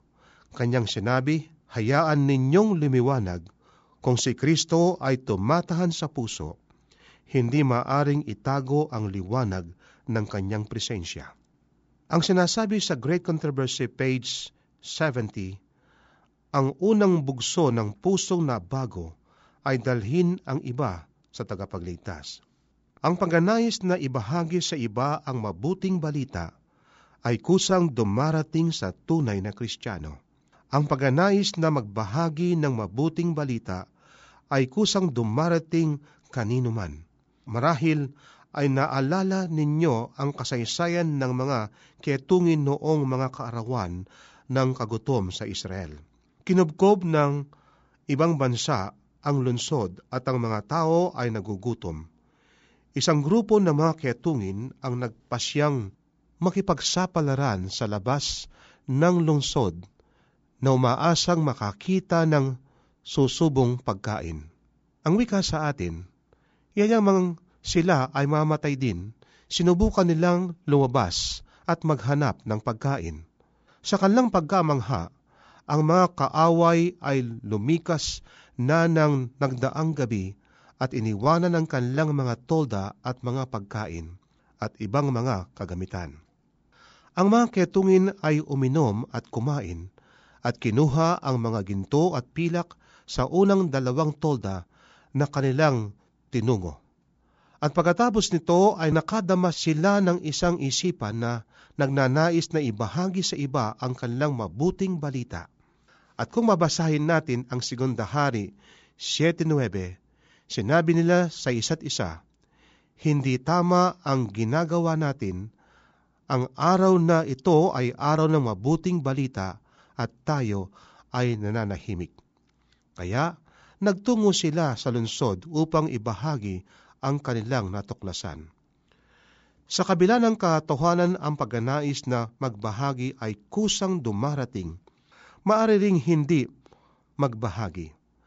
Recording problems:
high frequencies cut off; noticeable; nothing above 8 kHz

